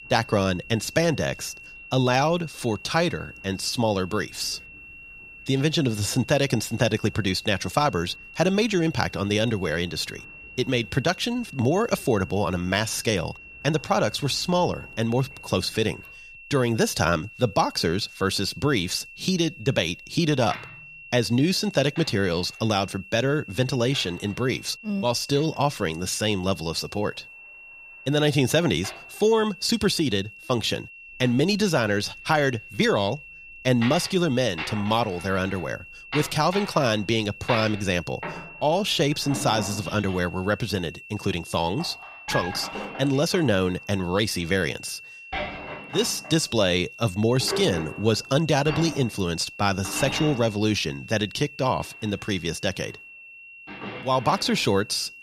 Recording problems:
high-pitched whine; noticeable; throughout; 2.5 kHz, 15 dB below the speech
household noises; noticeable; throughout; 10 dB below the speech

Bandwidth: 14.5 kHz